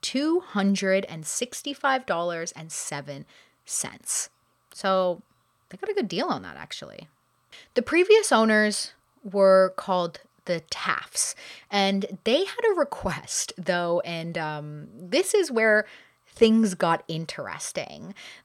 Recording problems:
none

